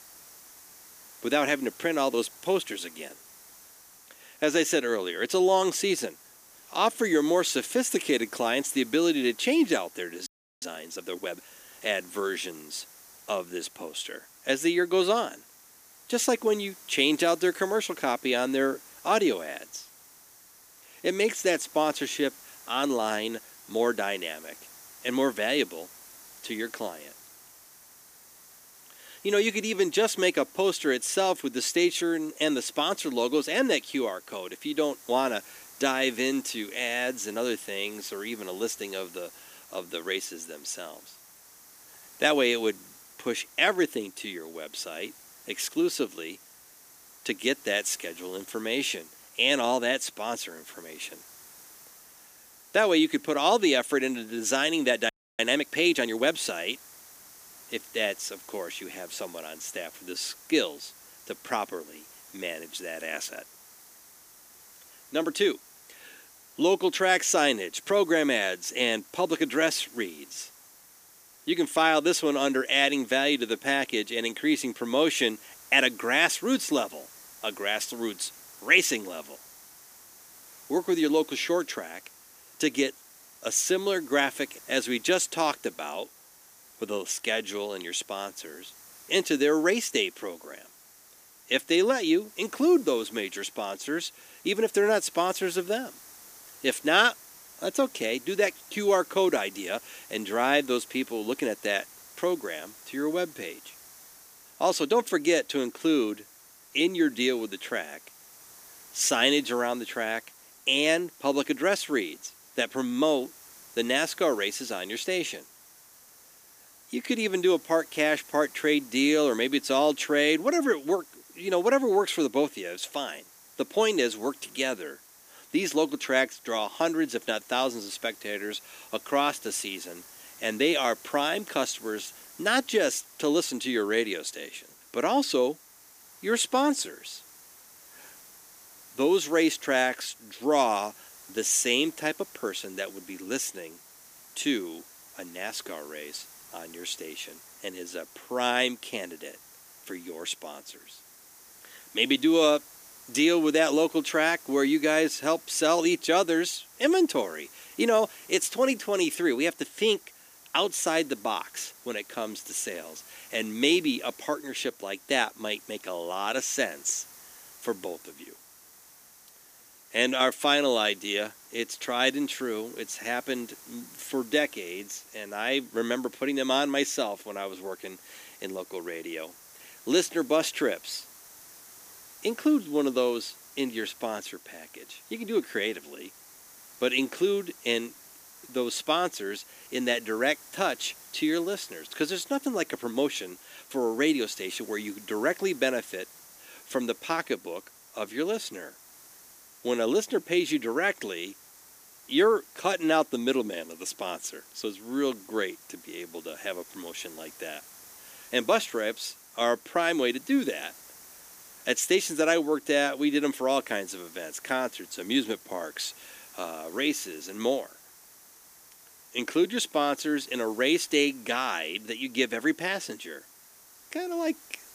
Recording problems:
thin; somewhat; fading below 300 Hz
hiss; faint; throughout; 20 dB below the speech
audio freezing; at 10 s and at 55 s

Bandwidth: 15 kHz